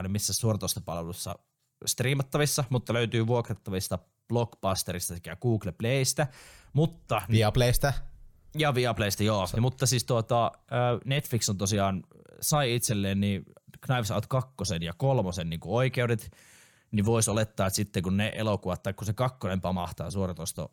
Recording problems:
abrupt cut into speech; at the start

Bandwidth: 19 kHz